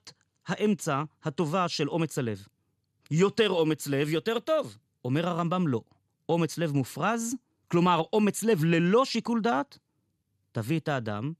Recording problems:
none

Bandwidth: 13.5 kHz